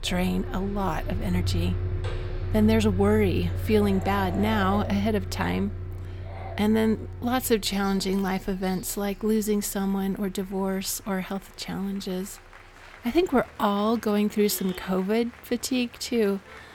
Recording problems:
traffic noise; loud; throughout; 7 dB below the speech
animal sounds; noticeable; until 9.5 s; 15 dB below the speech
crowd noise; faint; throughout; 25 dB below the speech

